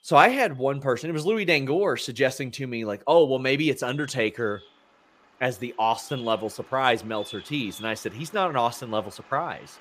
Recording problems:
animal sounds; faint; throughout; 20 dB below the speech

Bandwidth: 15 kHz